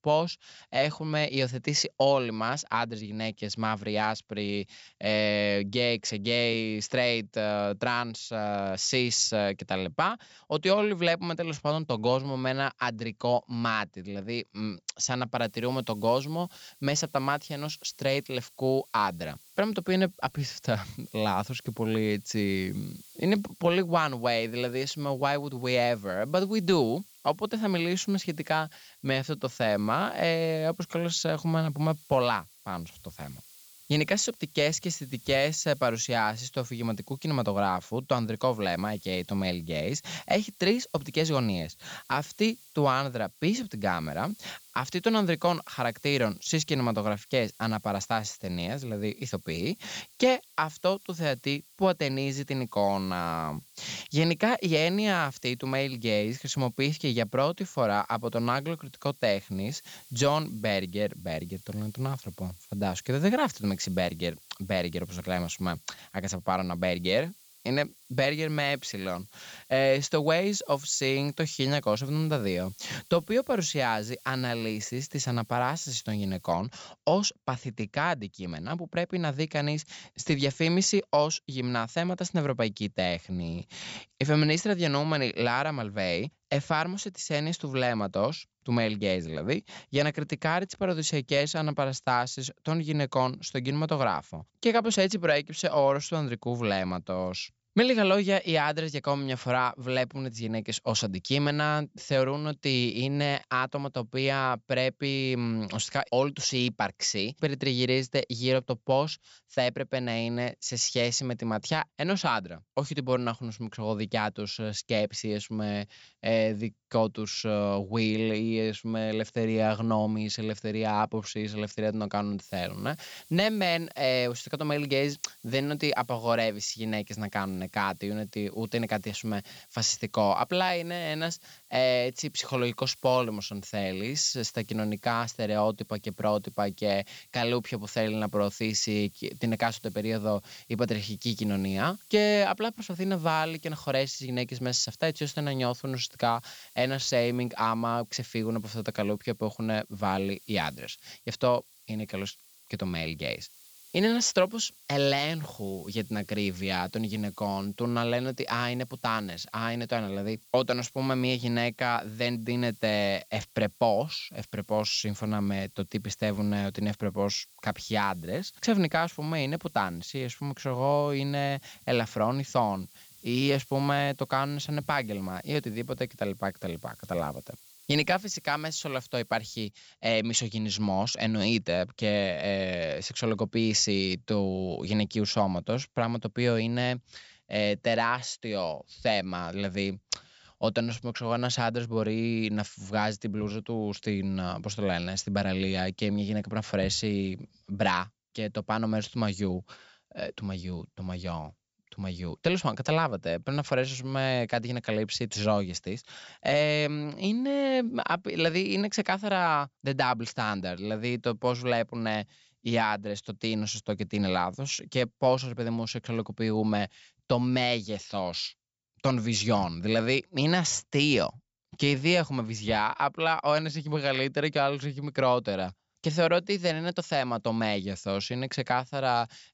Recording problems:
high frequencies cut off; noticeable; nothing above 8 kHz
hiss; faint; from 15 s to 1:17 and from 2:02 to 3:00; 25 dB below the speech

